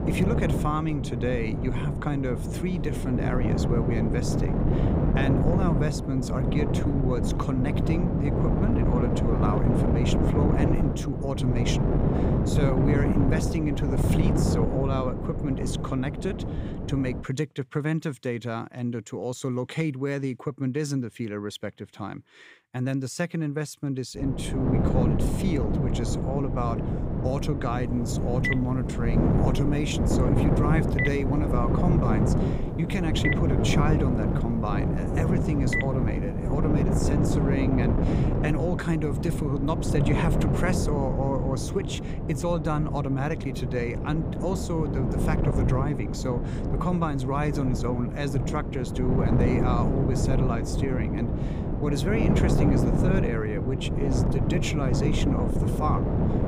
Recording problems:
wind noise on the microphone; heavy; until 17 s and from 24 s on; as loud as the speech
phone ringing; loud; from 28 to 36 s; peak level with the speech

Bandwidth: 15.5 kHz